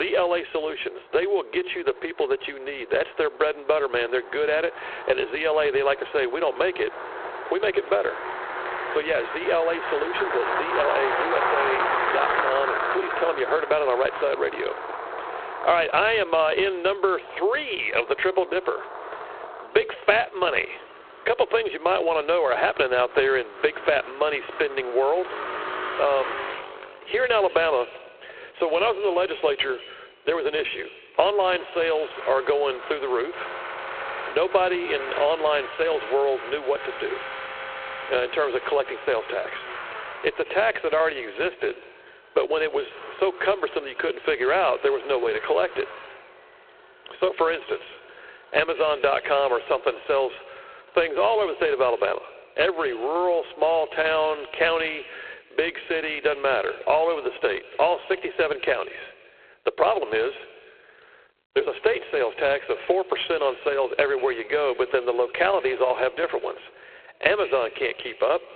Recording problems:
phone-call audio; poor line
echo of what is said; faint; from 25 s on; 190 ms later, 20 dB below the speech
squashed, flat; somewhat, background pumping
traffic noise; loud; throughout; 7 dB below the speech
abrupt cut into speech; at the start

